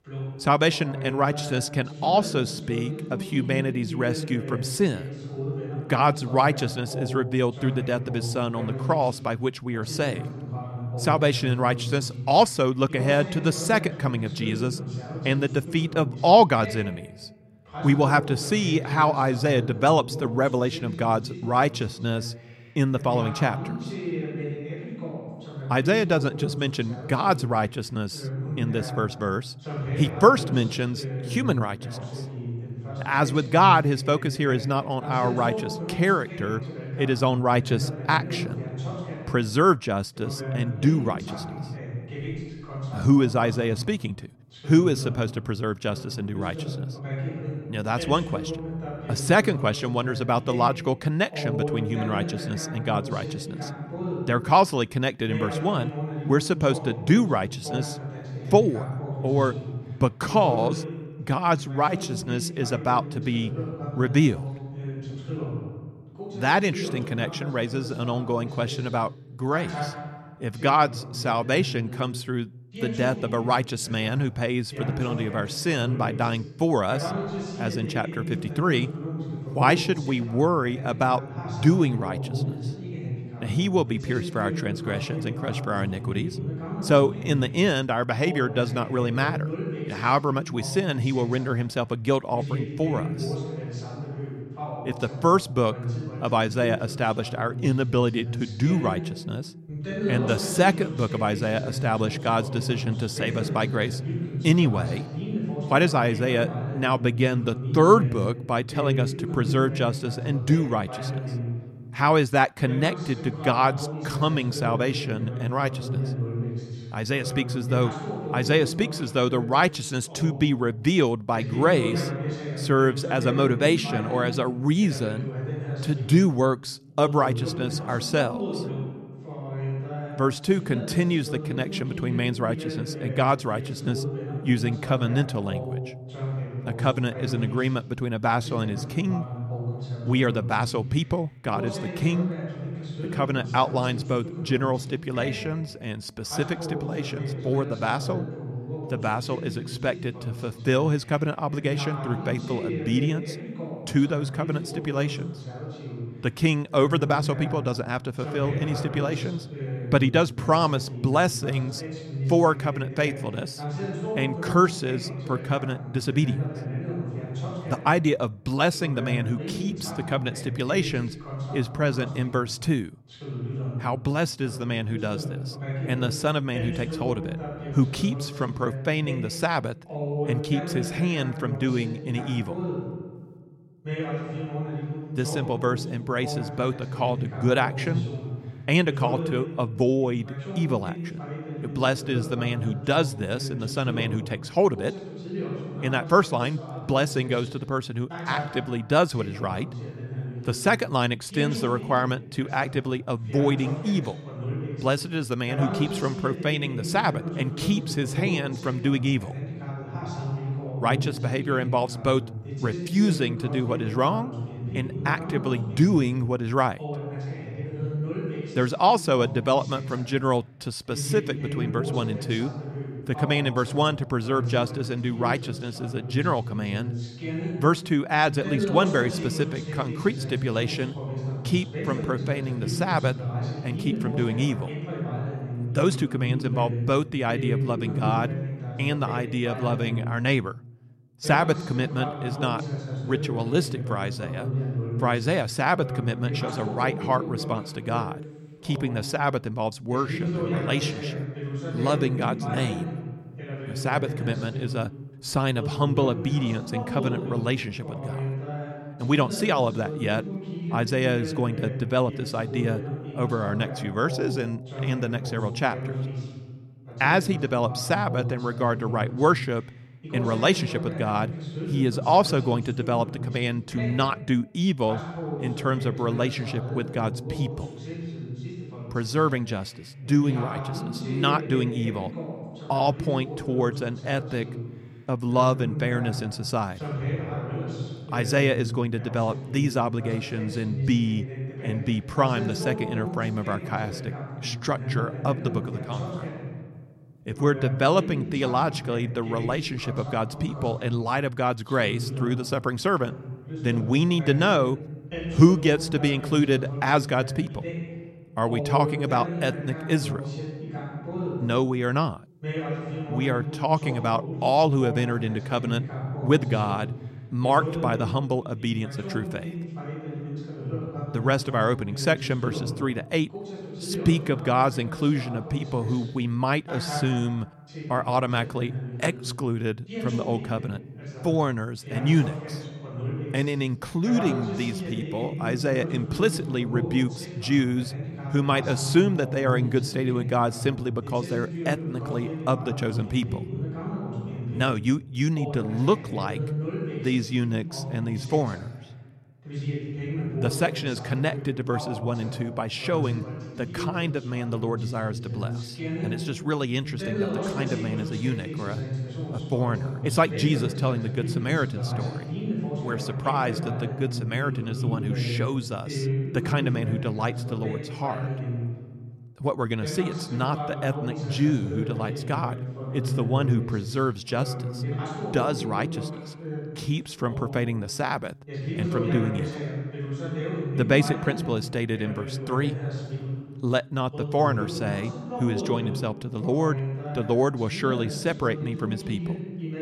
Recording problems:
voice in the background; loud; throughout; 7 dB below the speech

